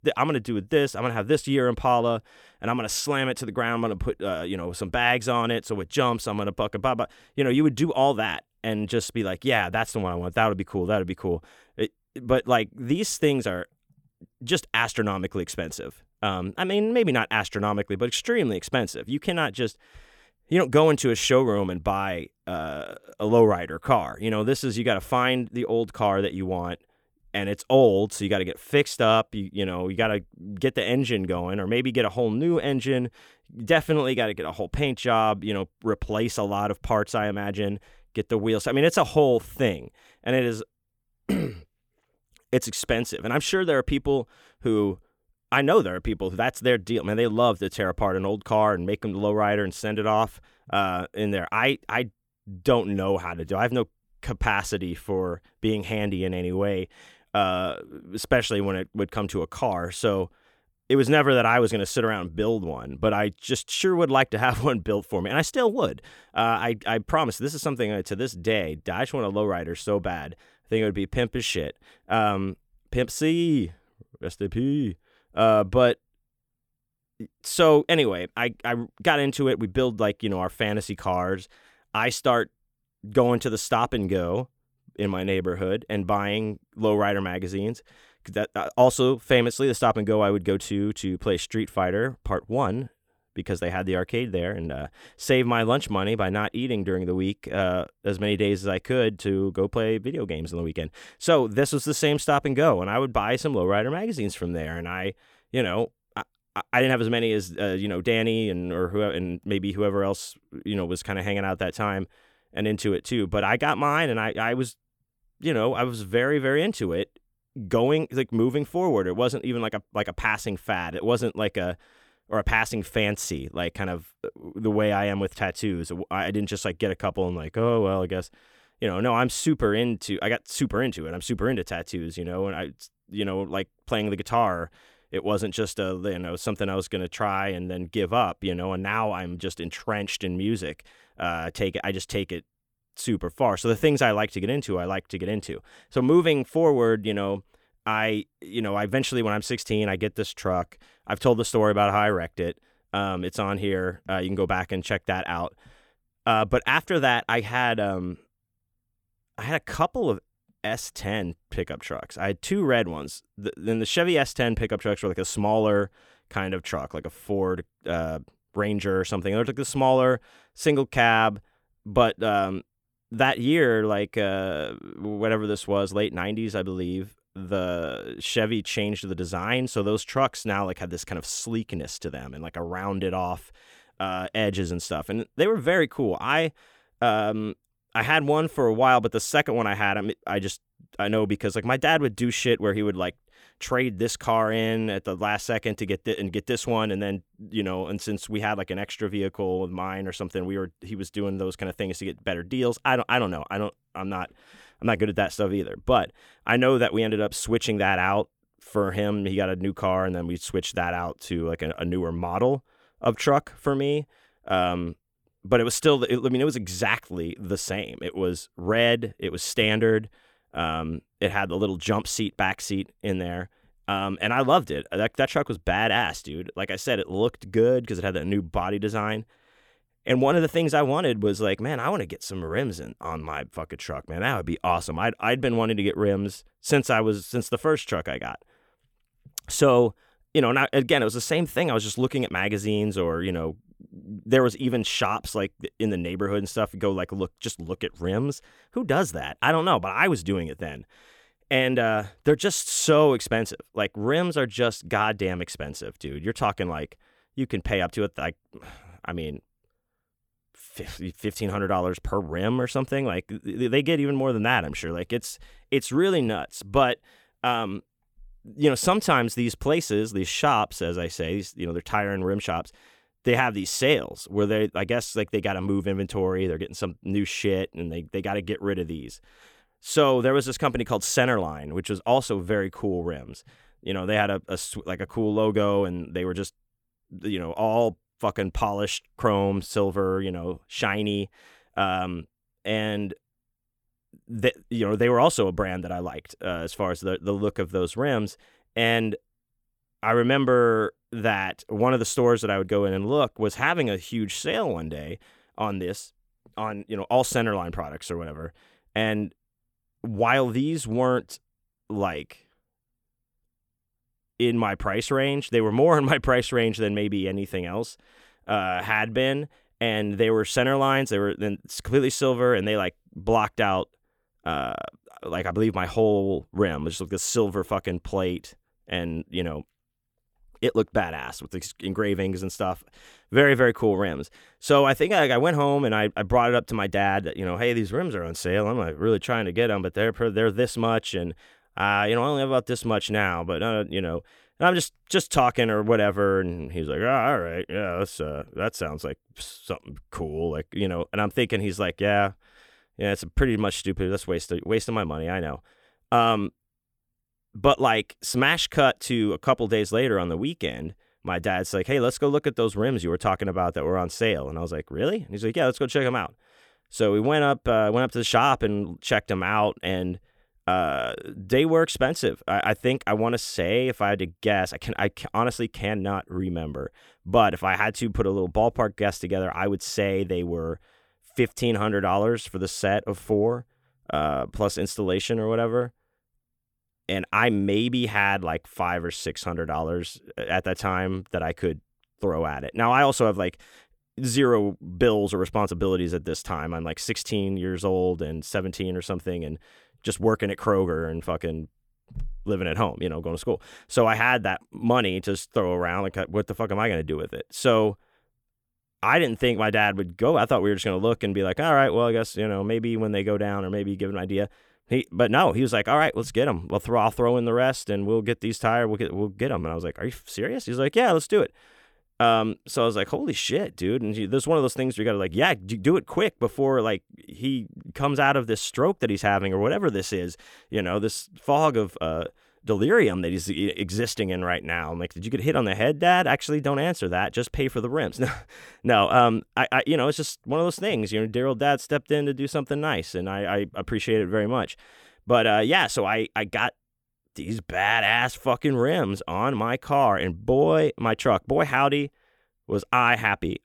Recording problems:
none

